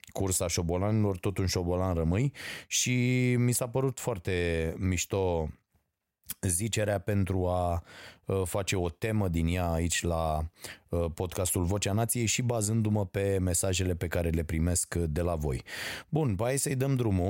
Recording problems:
abrupt cut into speech; at the end

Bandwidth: 16 kHz